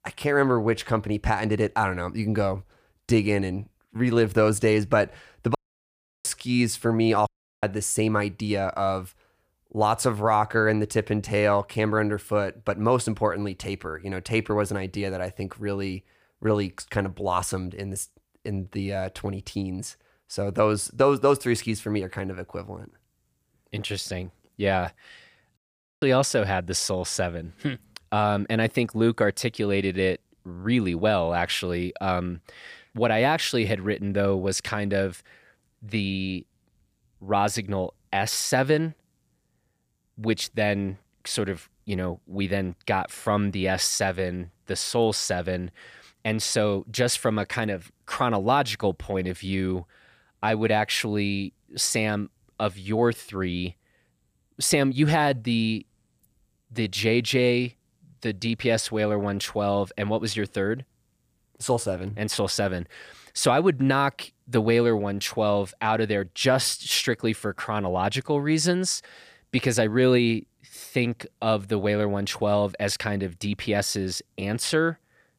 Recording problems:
audio cutting out; at 5.5 s for 0.5 s, at 7.5 s and at 26 s

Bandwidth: 15 kHz